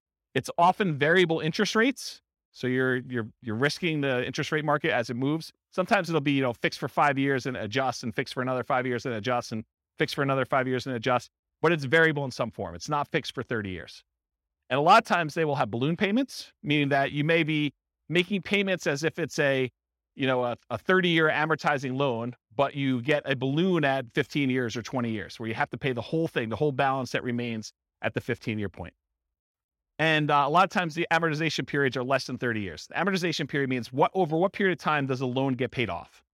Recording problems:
none

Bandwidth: 16 kHz